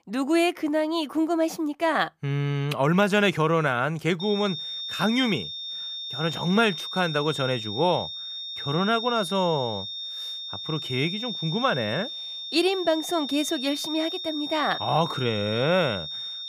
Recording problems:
high-pitched whine; loud; from 4 s on; 3.5 kHz, 6 dB below the speech

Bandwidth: 15 kHz